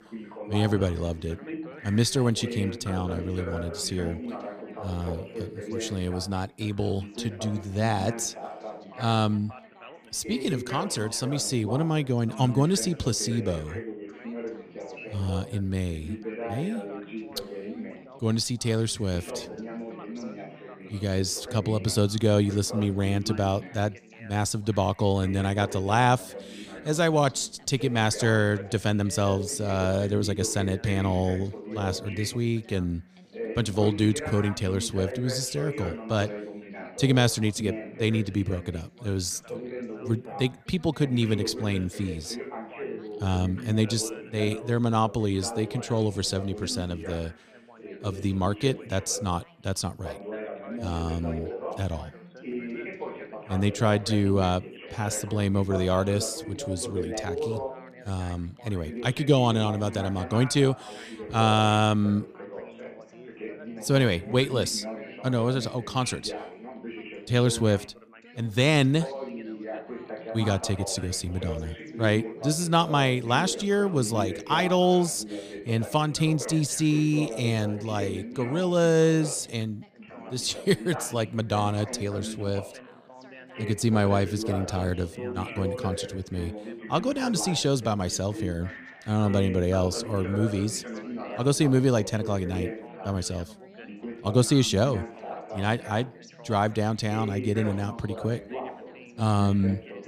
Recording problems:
background chatter; noticeable; throughout; 3 voices, 10 dB below the speech

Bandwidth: 15 kHz